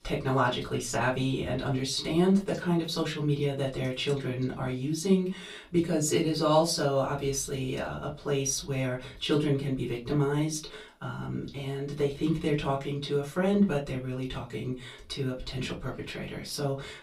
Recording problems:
off-mic speech; far
room echo; very slight; dies away in 0.2 s

